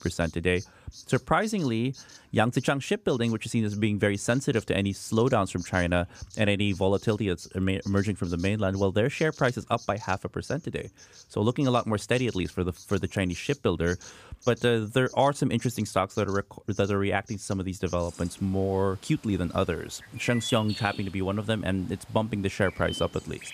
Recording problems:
animal sounds; noticeable; throughout; 20 dB below the speech

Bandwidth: 15 kHz